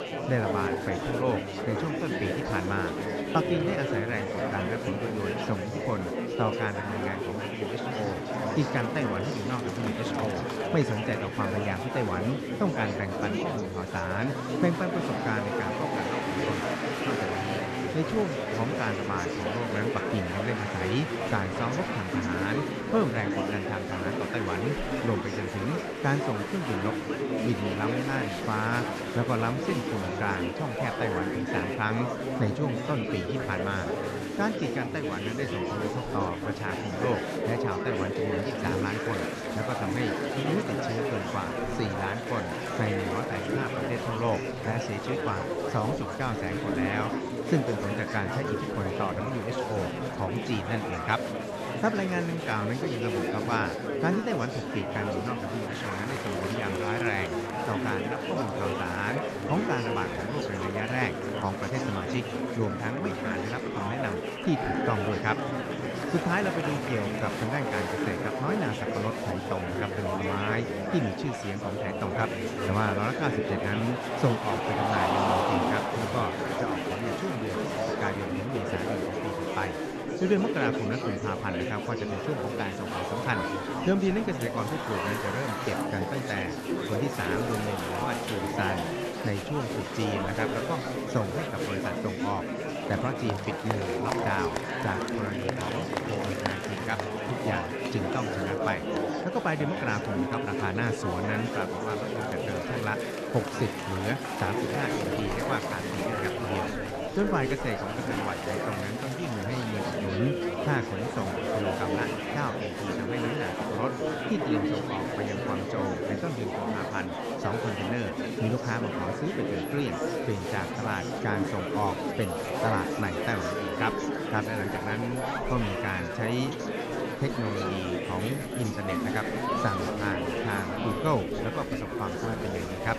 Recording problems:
murmuring crowd; very loud; throughout; 1 dB above the speech

